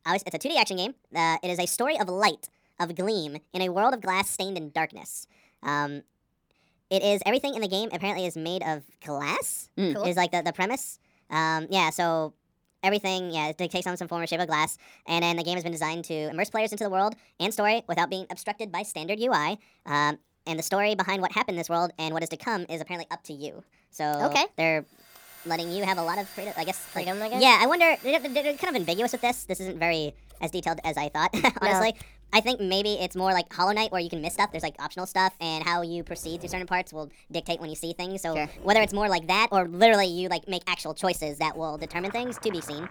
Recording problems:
wrong speed and pitch; too fast and too high; 1.5 times normal speed
household noises; faint; from 25 s on; 20 dB below the speech

